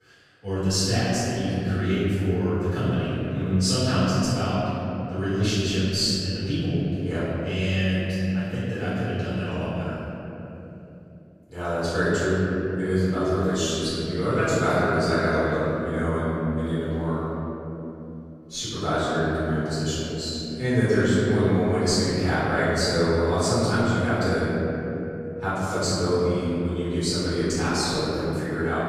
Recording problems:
room echo; strong; dies away in 3 s
off-mic speech; far

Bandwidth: 15 kHz